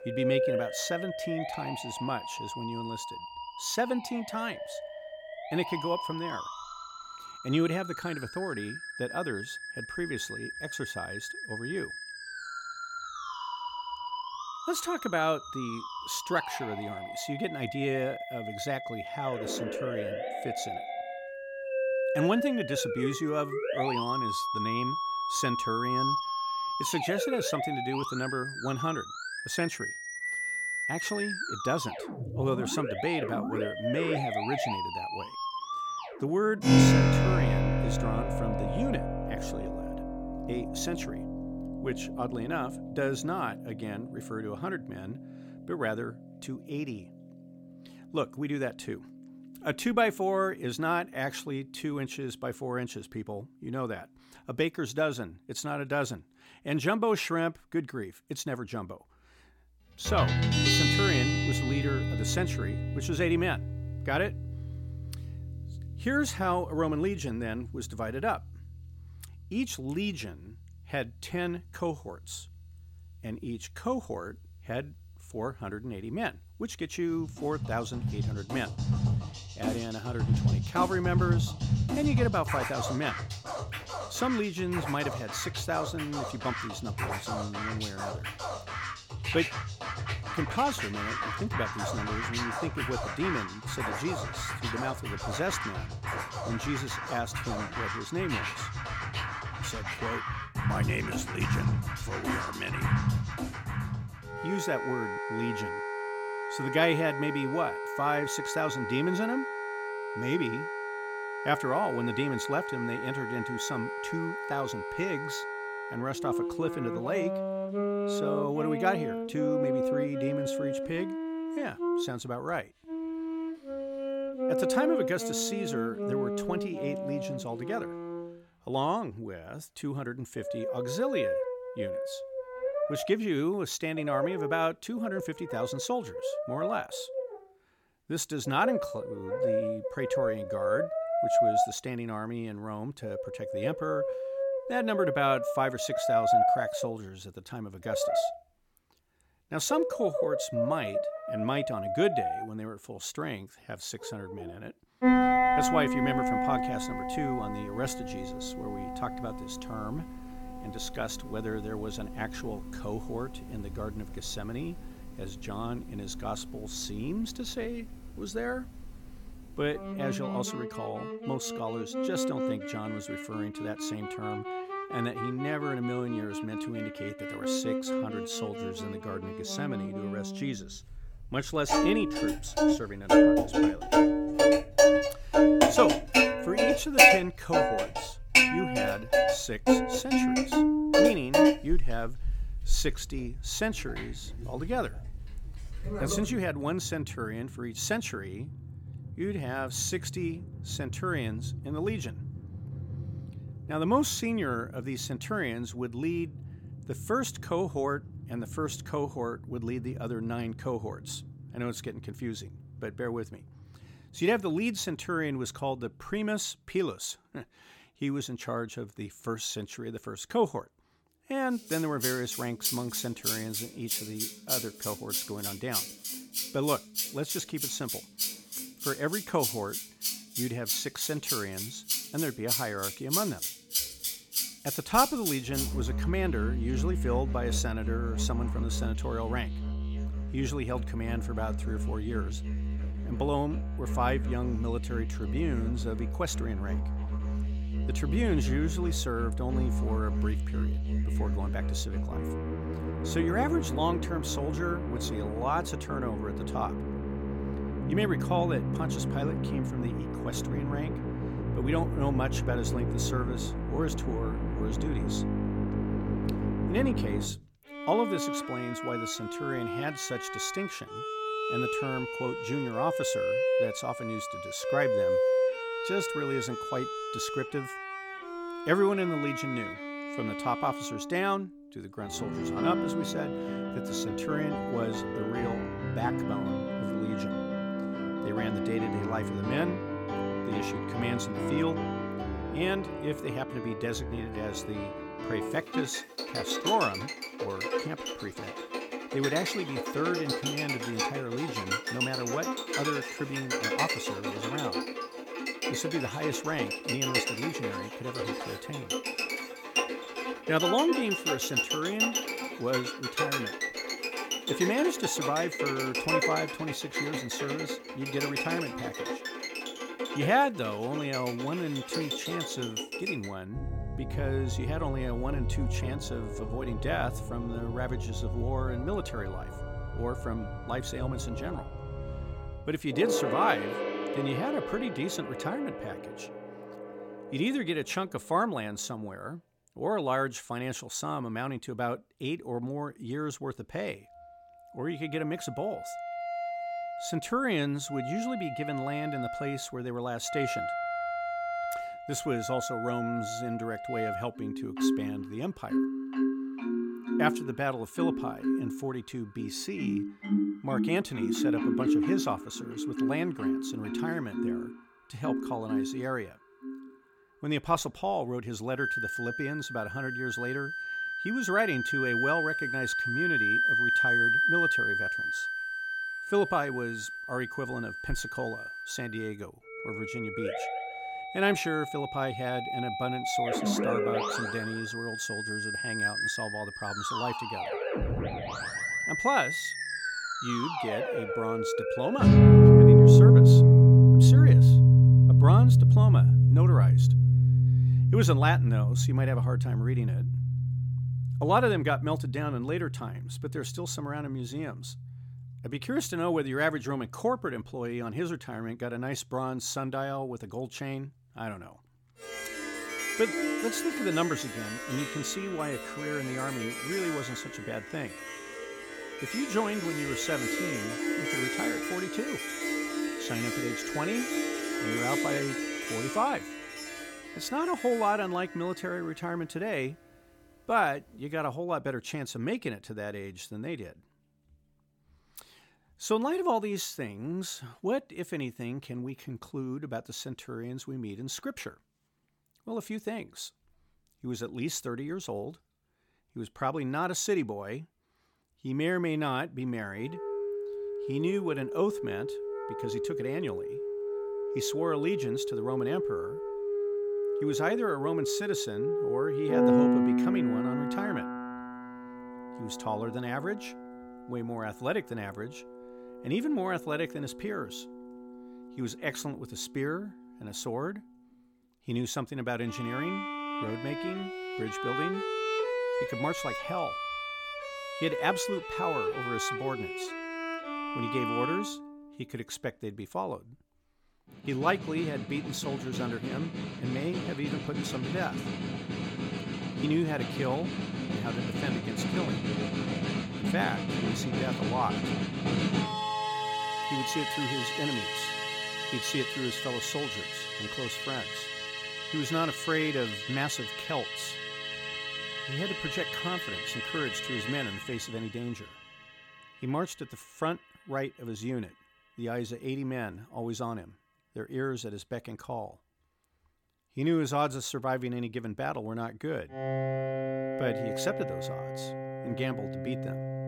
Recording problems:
background music; very loud; throughout; 4 dB above the speech

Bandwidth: 17 kHz